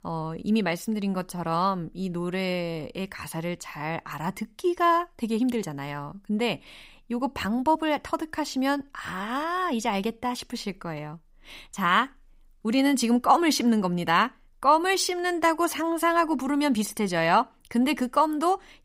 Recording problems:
none

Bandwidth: 15.5 kHz